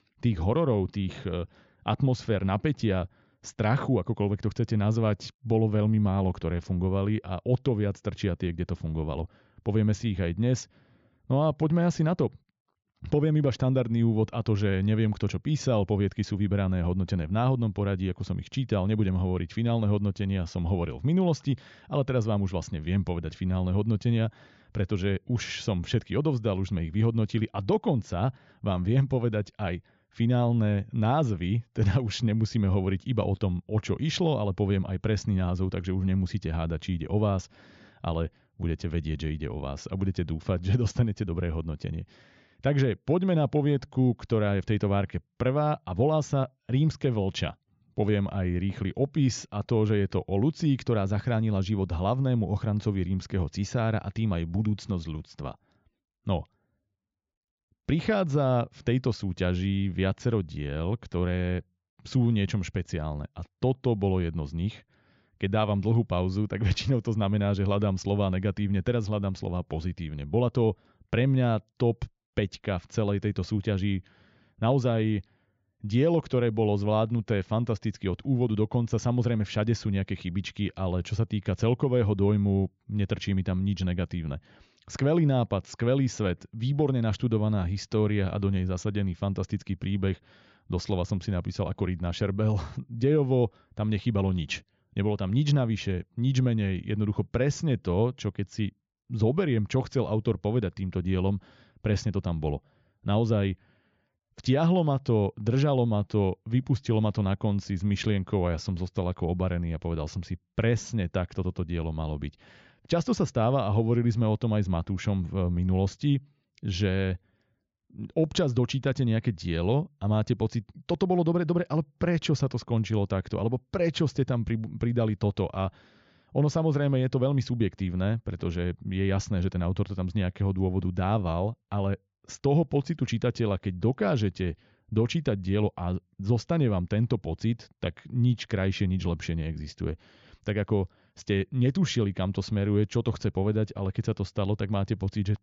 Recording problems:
high frequencies cut off; noticeable; nothing above 7.5 kHz

